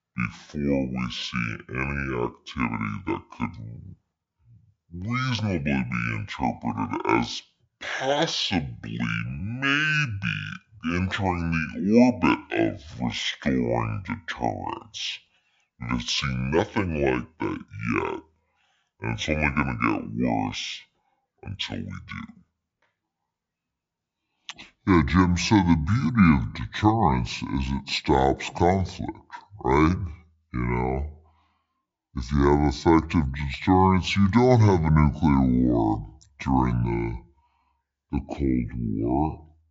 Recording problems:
wrong speed and pitch; too slow and too low; 0.6 times normal speed

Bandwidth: 7.5 kHz